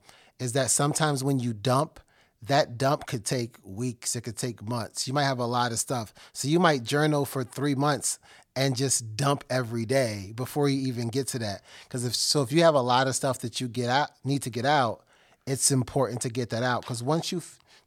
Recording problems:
none

